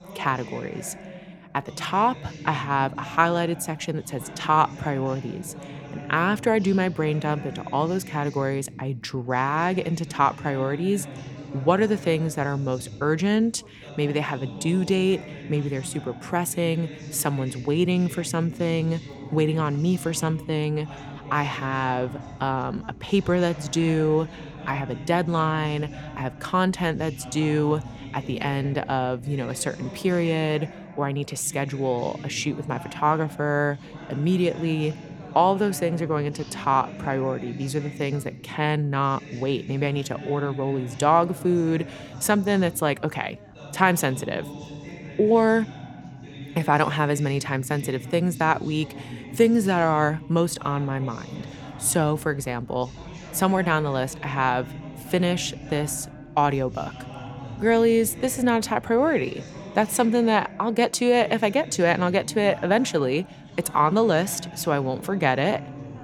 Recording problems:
background chatter; noticeable; throughout; 2 voices, 15 dB below the speech

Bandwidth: 18 kHz